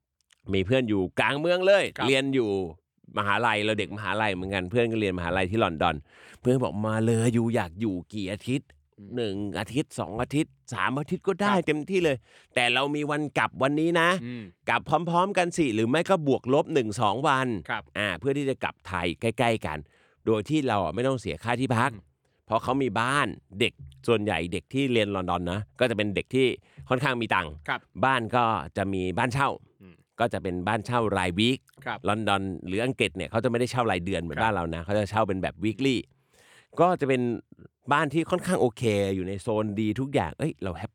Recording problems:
none

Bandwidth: 18.5 kHz